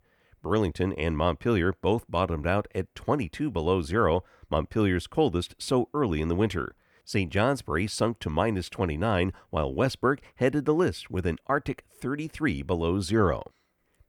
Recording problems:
none

